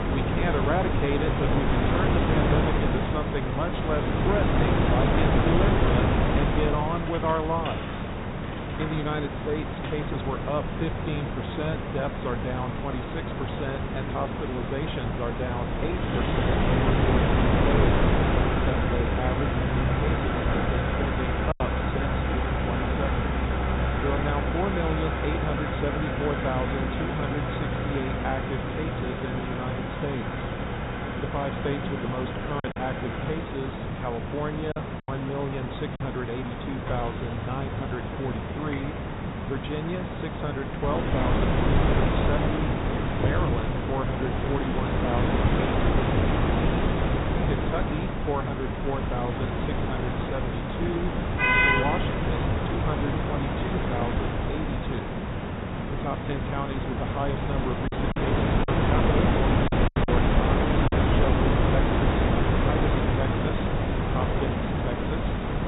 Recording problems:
high frequencies cut off; severe; nothing above 4 kHz
traffic noise; very loud; throughout; as loud as the speech
wind noise on the microphone; heavy; until 24 s and from 41 s on; 3 dB above the speech
hiss; loud; throughout; 1 dB below the speech
choppy; very; at 22 s, from 33 to 36 s and from 58 s to 1:00; 6% of the speech affected

